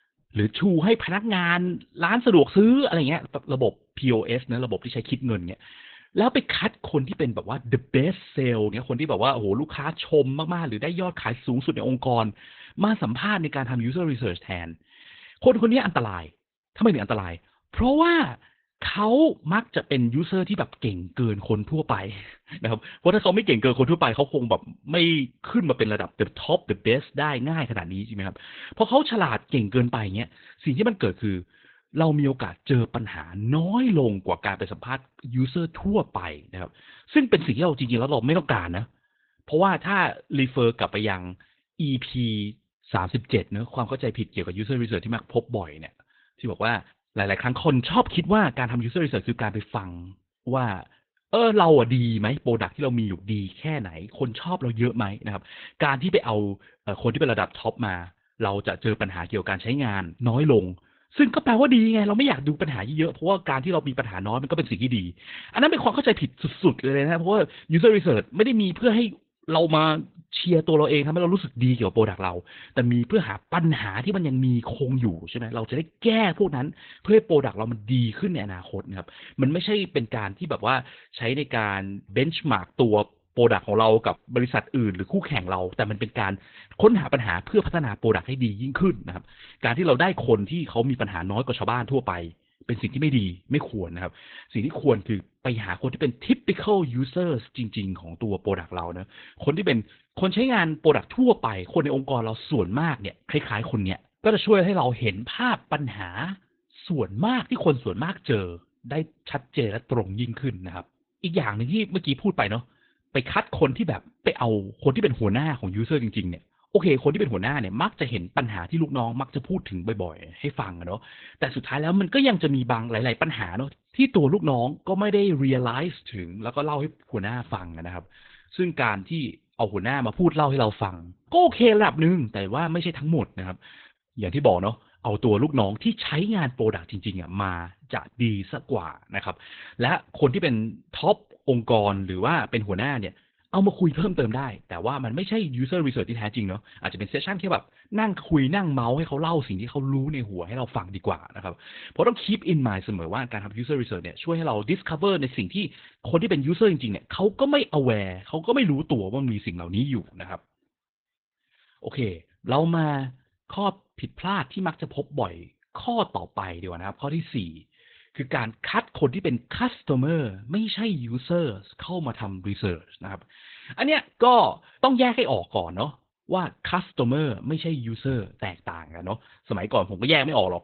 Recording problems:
garbled, watery; badly; nothing above 4 kHz

